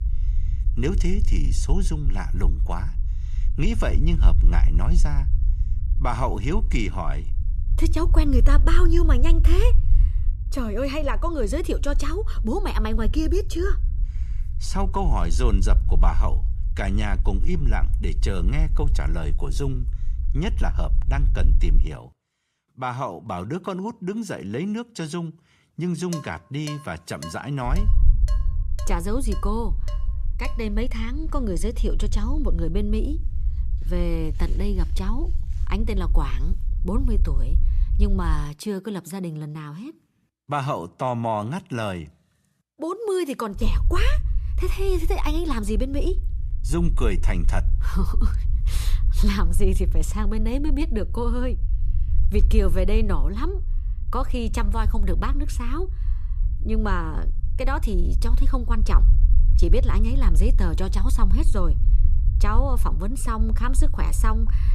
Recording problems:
low rumble; noticeable; until 22 s, from 28 to 38 s and from 44 s on; 15 dB below the speech
clattering dishes; noticeable; from 26 to 31 s; peak 9 dB below the speech

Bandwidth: 14.5 kHz